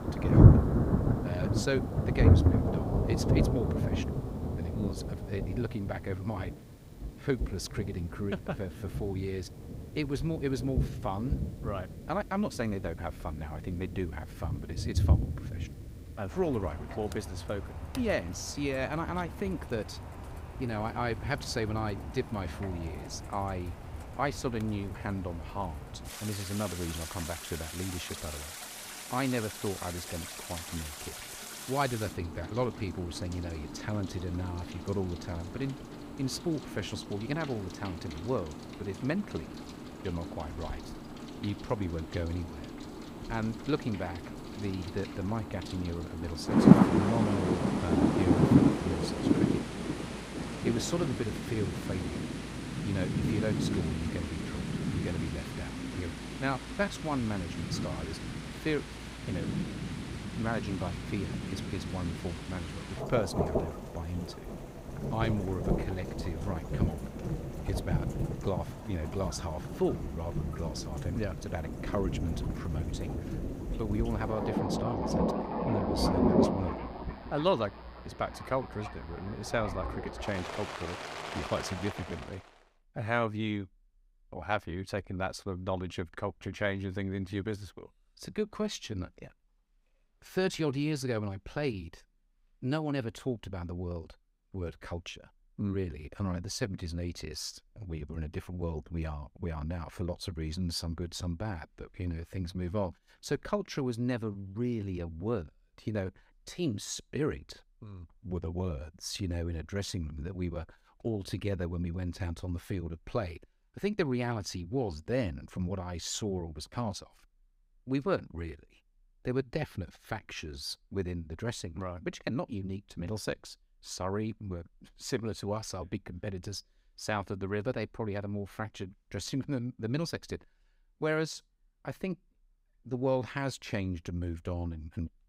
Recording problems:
rain or running water; very loud; until 1:22; 3 dB above the speech

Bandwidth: 15.5 kHz